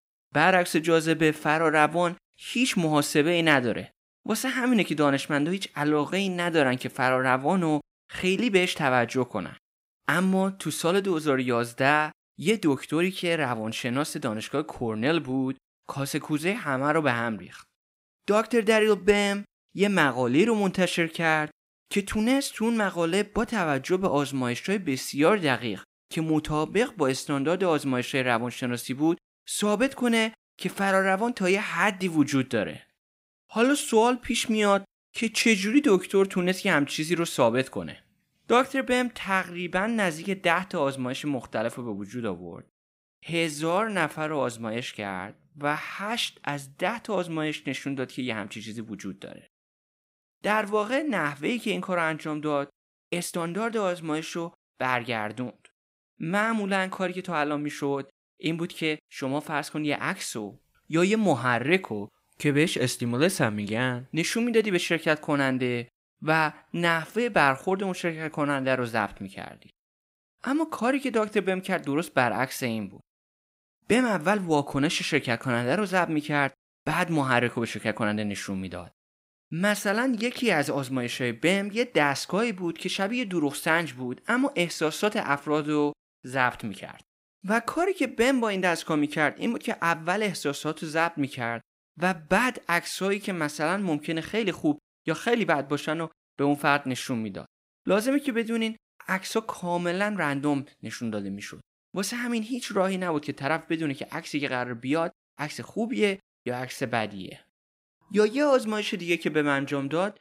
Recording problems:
uneven, jittery; strongly; from 12 s to 1:47

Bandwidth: 15.5 kHz